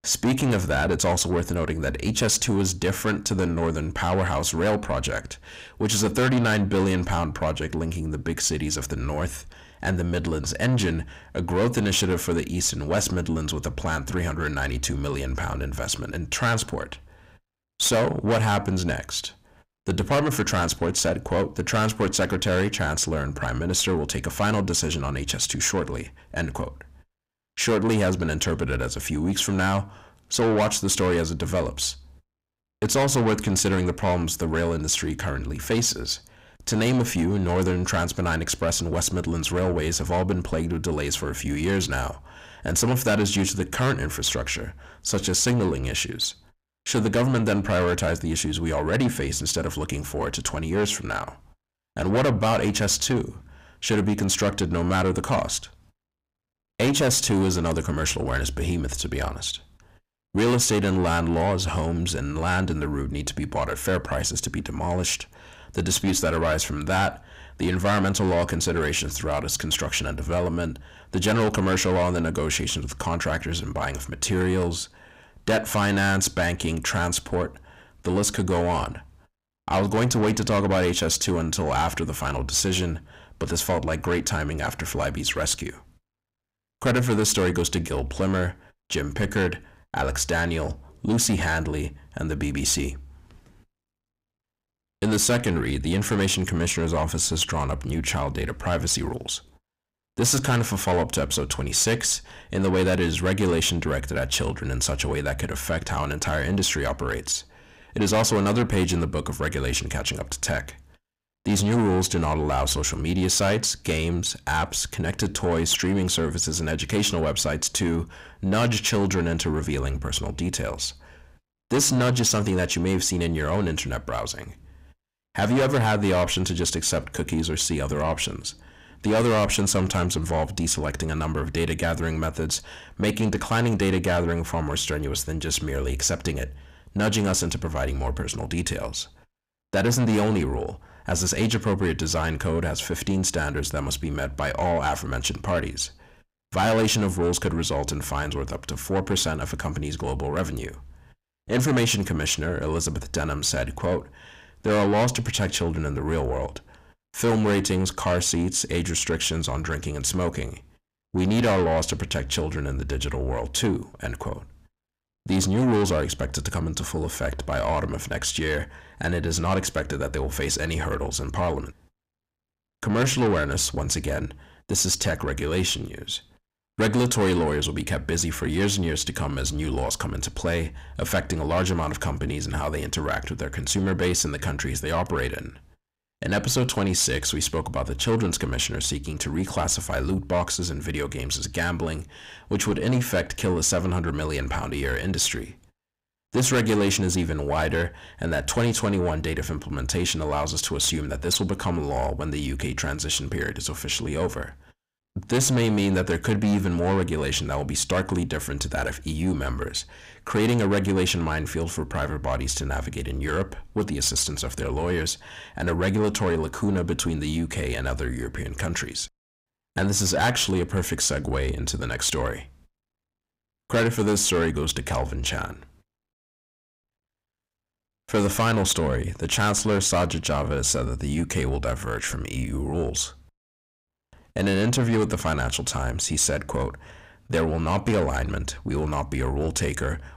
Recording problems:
distortion; heavy; 7 dB below the speech

